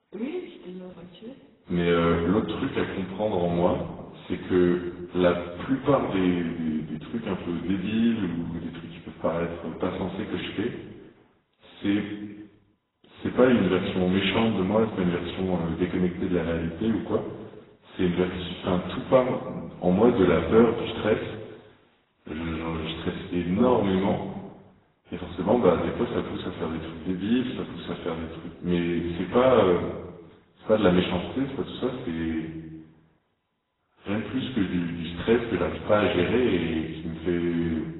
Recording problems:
off-mic speech; far
garbled, watery; badly; nothing above 4 kHz
room echo; noticeable; dies away in 1.1 s

